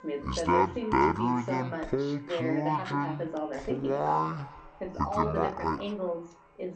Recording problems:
wrong speed and pitch; too slow and too low; 0.6 times normal speed
echo of what is said; faint; throughout; 340 ms later, 20 dB below the speech
voice in the background; loud; throughout; 6 dB below the speech
background music; faint; until 4.5 s; 30 dB below the speech

